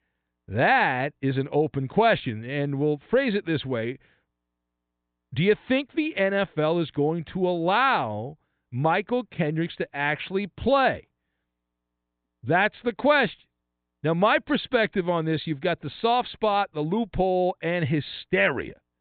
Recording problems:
high frequencies cut off; severe; nothing above 4 kHz

